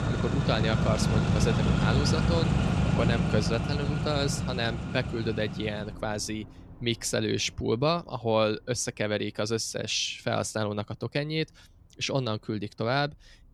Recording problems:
traffic noise; very loud; throughout; 2 dB above the speech

